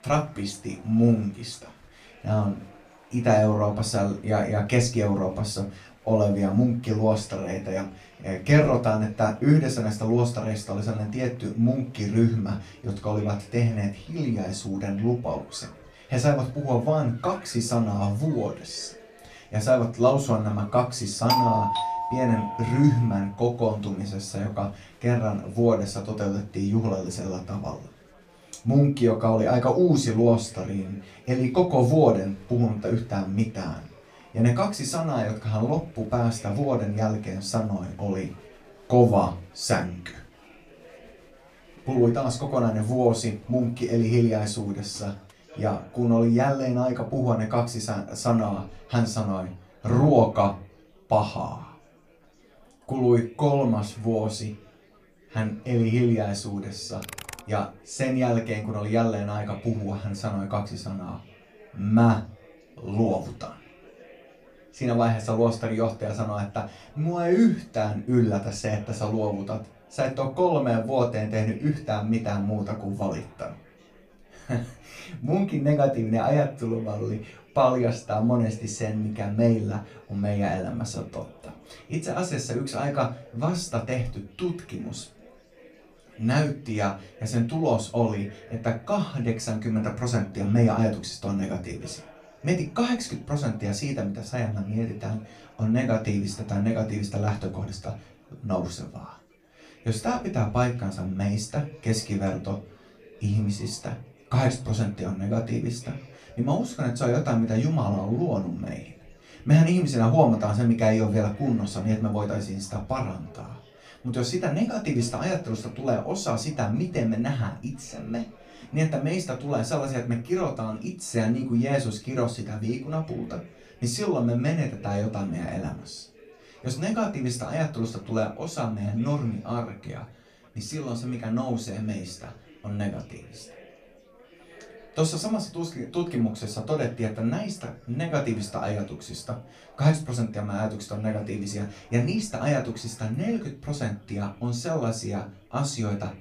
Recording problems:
off-mic speech; far
room echo; very slight; dies away in 0.2 s
chatter from many people; faint; throughout; 25 dB below the speech
doorbell; loud; from 21 to 23 s; peak 4 dB above the speech
keyboard typing; faint; at 57 s; peak 10 dB below the speech

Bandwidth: 14.5 kHz